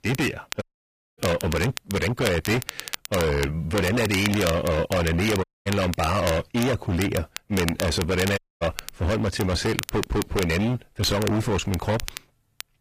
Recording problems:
distortion; heavy; 28% of the sound clipped
garbled, watery; slightly; nothing above 14.5 kHz
crackle, like an old record; noticeable; 10 dB below the speech
audio cutting out; at 0.5 s for 0.5 s, at 5.5 s and at 8.5 s

